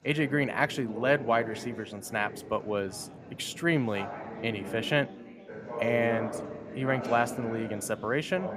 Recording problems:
background chatter; loud; throughout; 4 voices, 9 dB below the speech

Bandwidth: 14.5 kHz